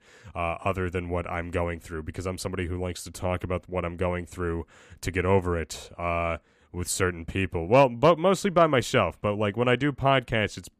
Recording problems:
none

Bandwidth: 14.5 kHz